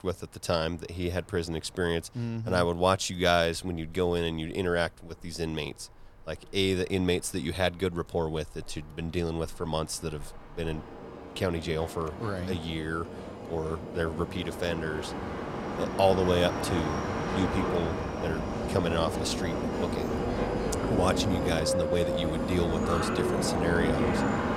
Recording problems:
train or aircraft noise; loud; throughout; 1 dB below the speech

